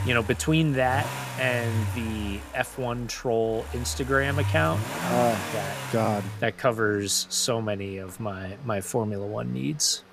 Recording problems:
traffic noise; loud; throughout; 6 dB below the speech

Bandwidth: 15 kHz